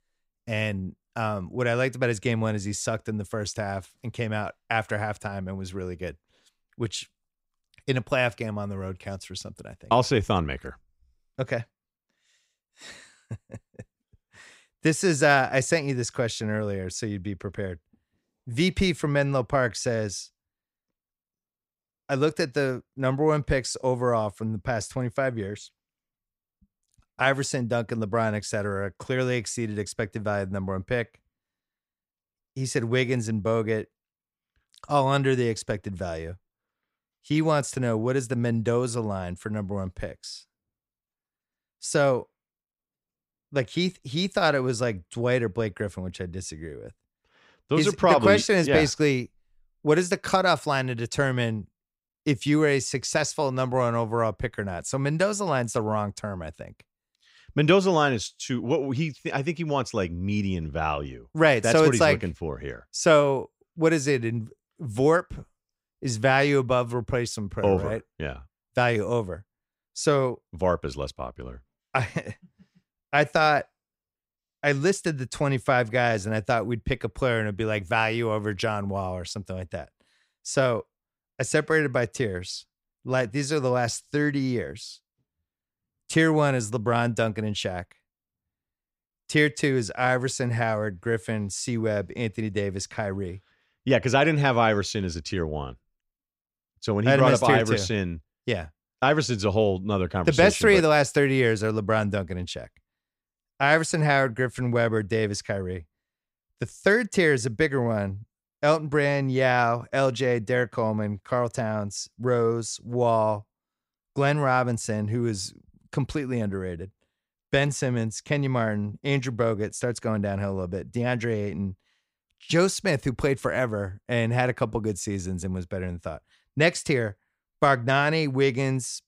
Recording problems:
none

